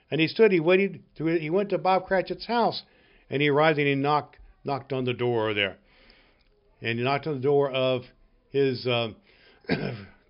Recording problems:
high frequencies cut off; noticeable; nothing above 5.5 kHz

